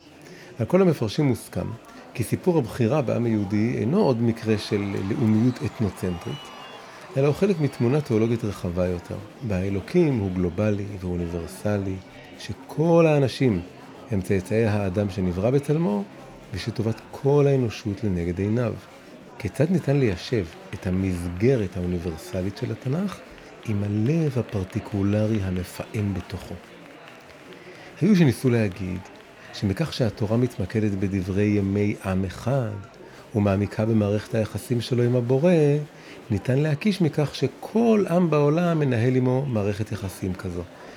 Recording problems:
murmuring crowd; noticeable; throughout; 20 dB below the speech

